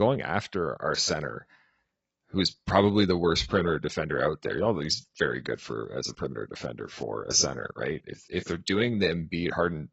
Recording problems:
garbled, watery; badly; nothing above 6.5 kHz
abrupt cut into speech; at the start

